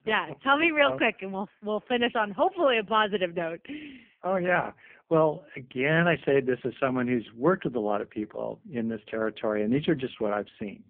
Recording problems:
phone-call audio; poor line; nothing above 3 kHz

